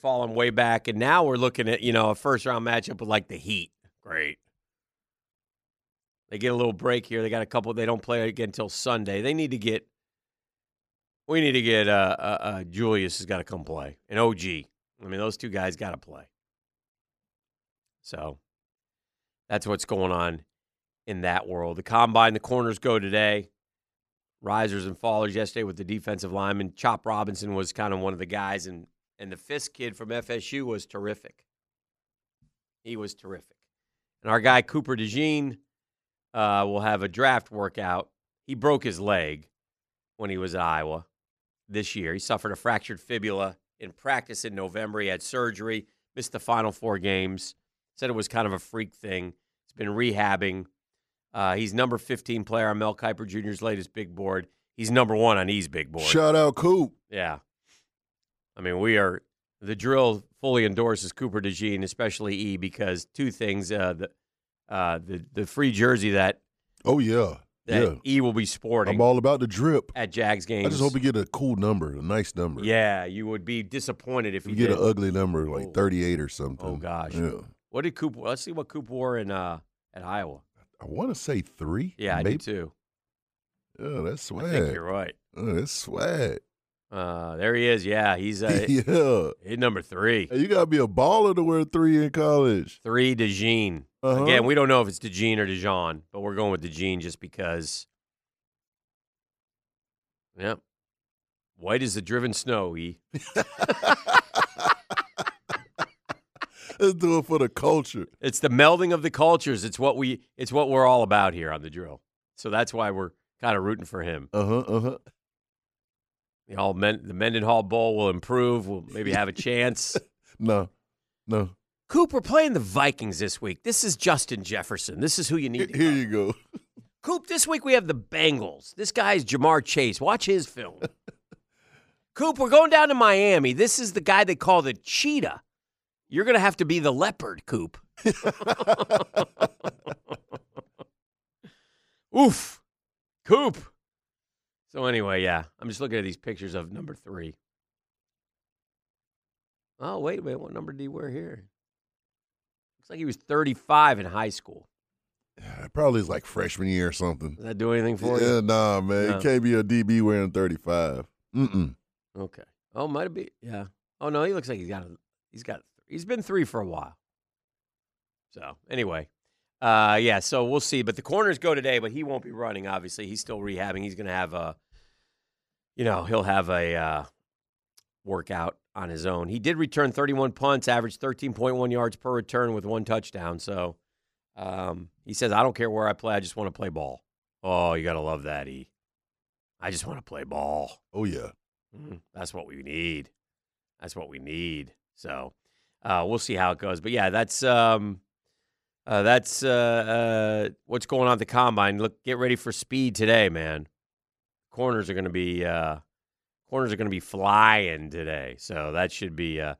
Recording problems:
none

